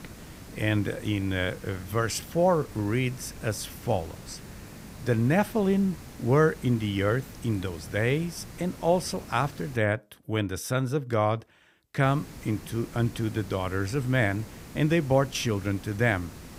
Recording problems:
hiss; noticeable; until 10 s and from 12 s on; 15 dB below the speech

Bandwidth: 15.5 kHz